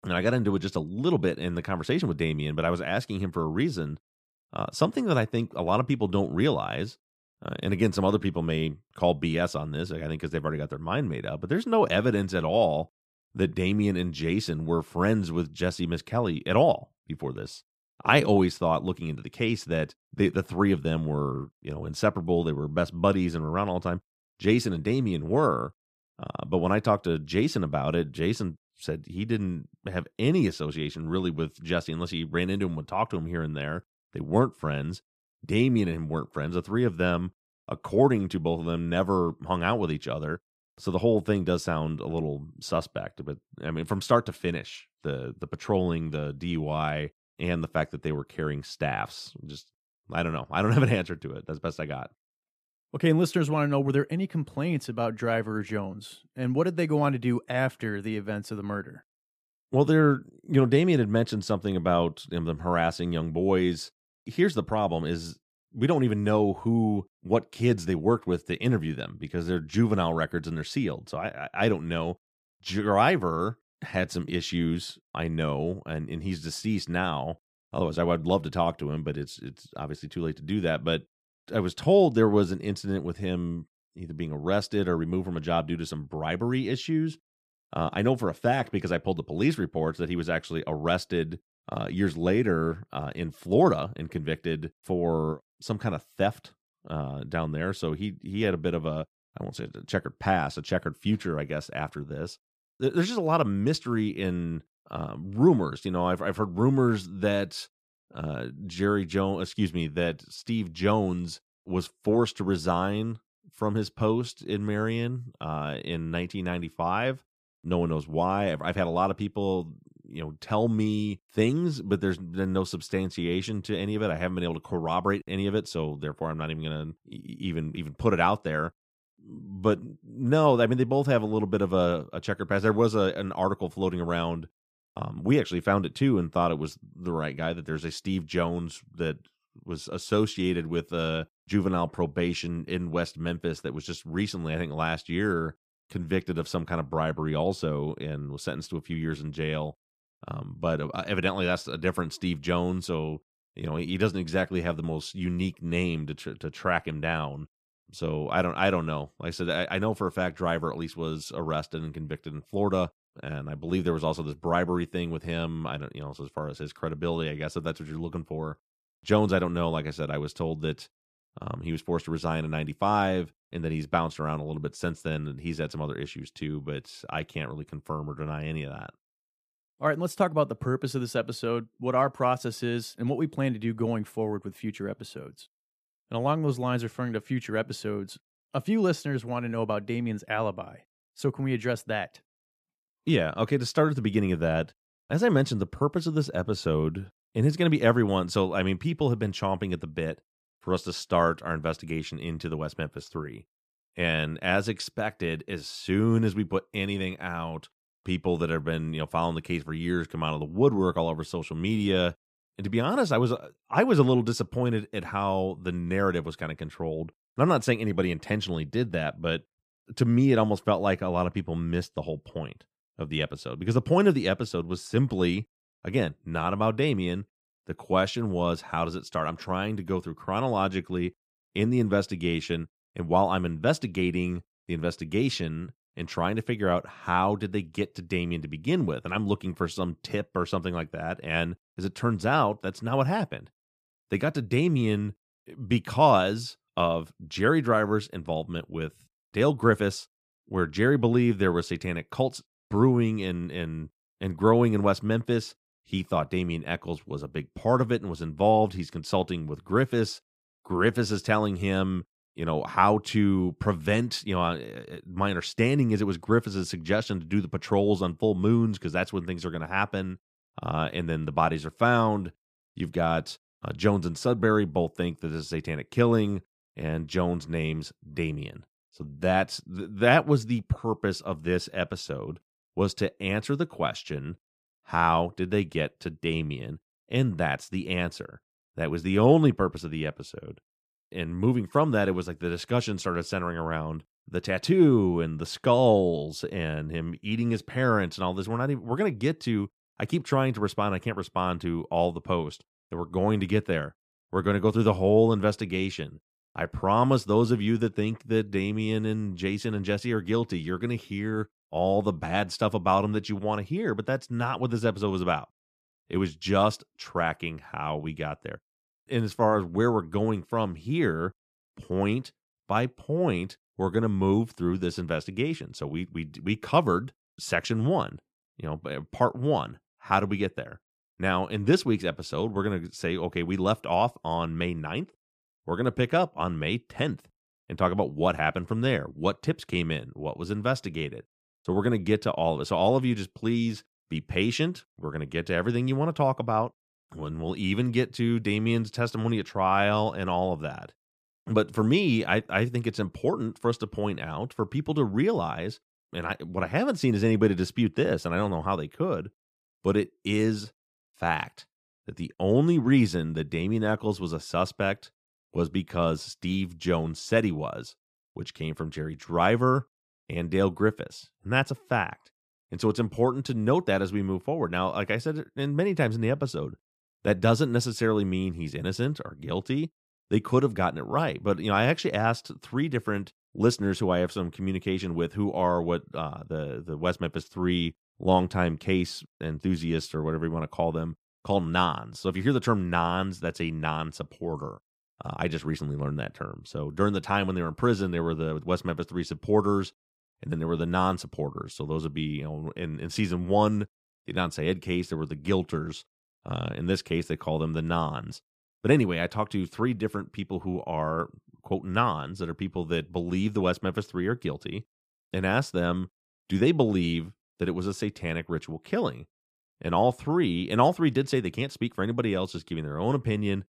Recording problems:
none

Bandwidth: 14.5 kHz